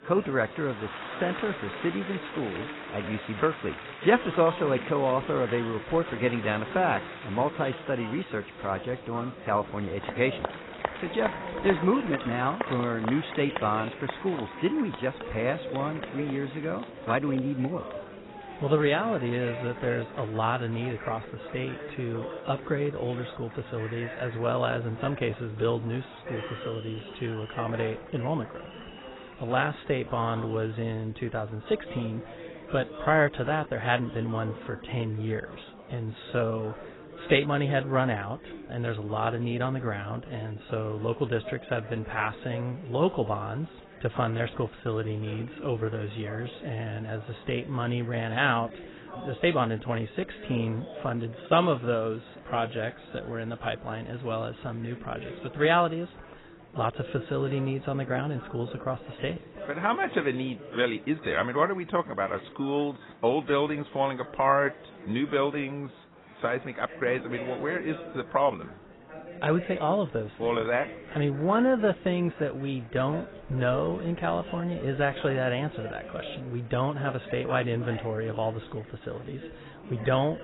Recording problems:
garbled, watery; badly; nothing above 4 kHz
murmuring crowd; noticeable; throughout; 10 dB below the speech

